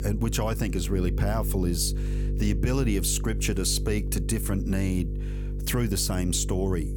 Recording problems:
electrical hum; noticeable; throughout; 50 Hz, 15 dB below the speech

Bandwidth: 18 kHz